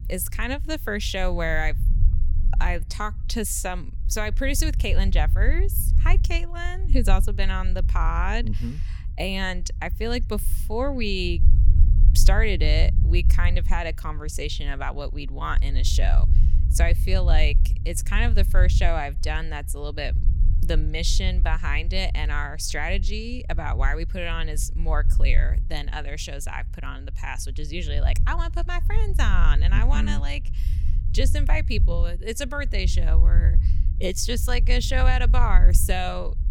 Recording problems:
low rumble; noticeable; throughout; 15 dB below the speech

